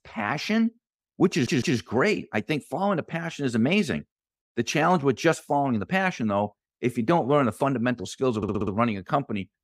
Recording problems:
audio stuttering; at 1.5 s and at 8.5 s

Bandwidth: 15.5 kHz